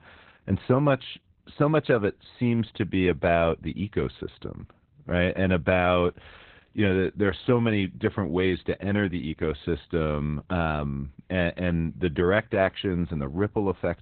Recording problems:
garbled, watery; badly; nothing above 3.5 kHz

